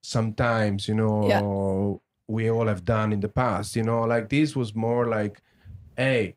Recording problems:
none

